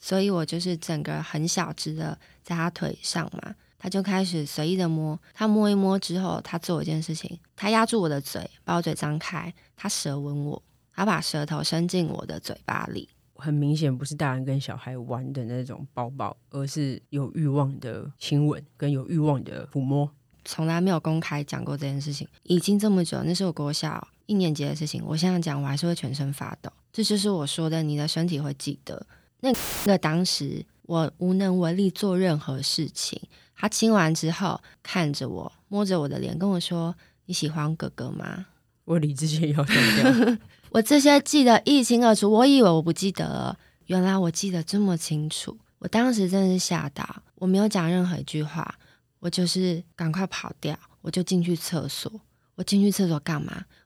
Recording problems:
audio cutting out; filled with static; at 30 s

